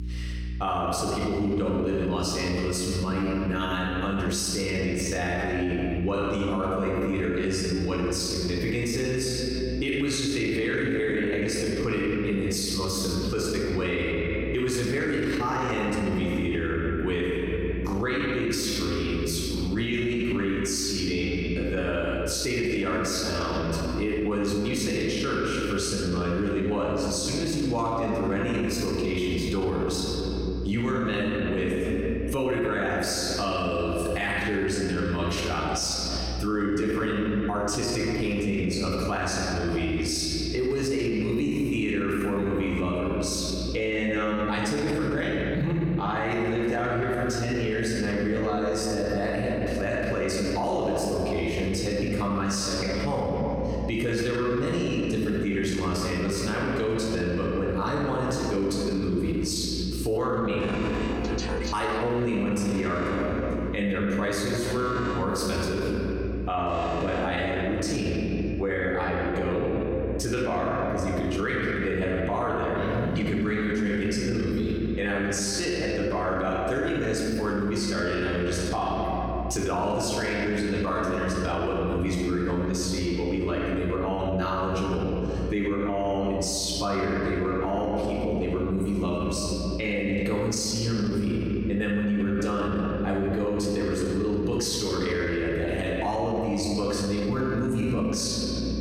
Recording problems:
off-mic speech; far
room echo; noticeable; dies away in 2.1 s
squashed, flat; somewhat
electrical hum; faint; throughout; 60 Hz, 25 dB below the speech
alarm; noticeable; from 1:01 to 1:08; peak 5 dB below the speech

